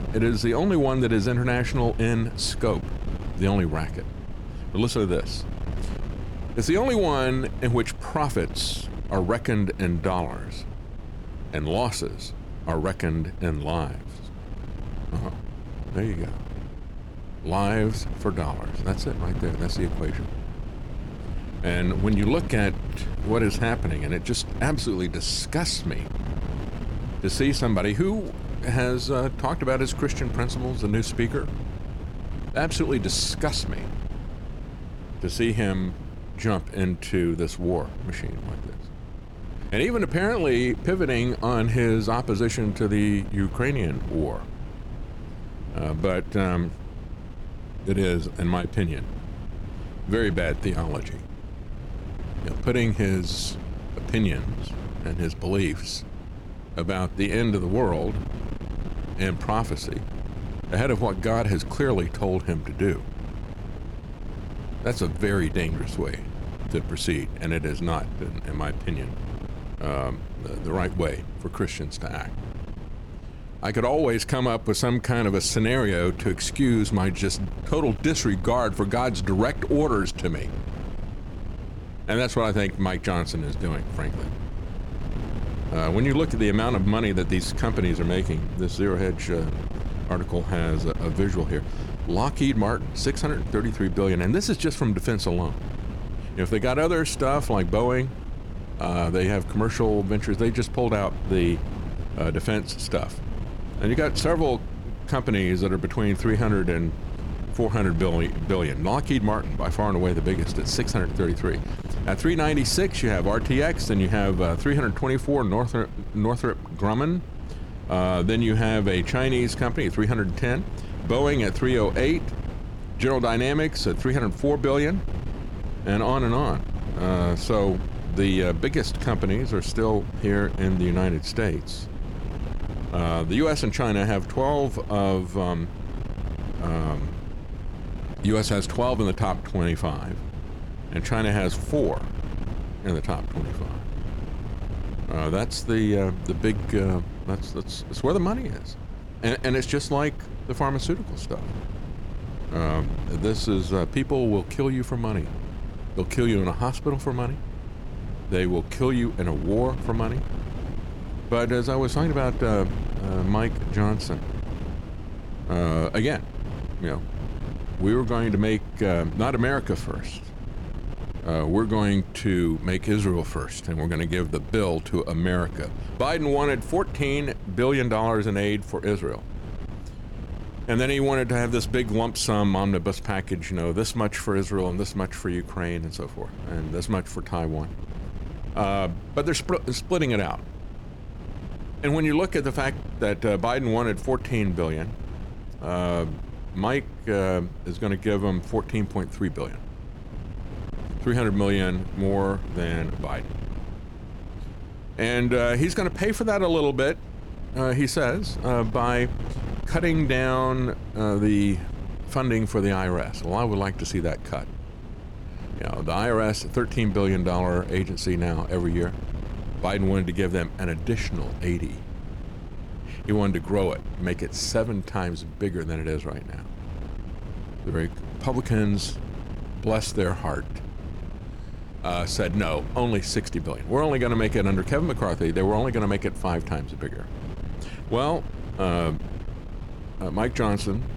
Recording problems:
wind noise on the microphone; occasional gusts; 15 dB below the speech

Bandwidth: 17.5 kHz